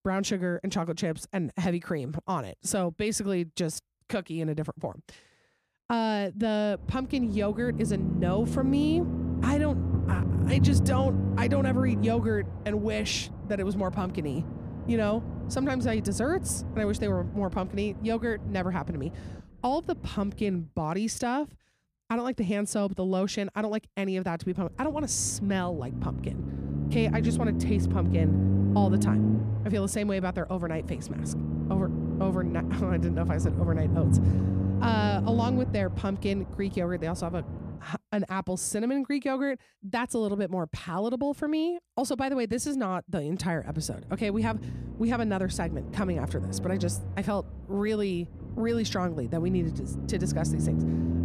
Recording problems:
low rumble; loud; from 7 to 21 s, from 25 to 38 s and from 44 s on; 7 dB below the speech

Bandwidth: 14.5 kHz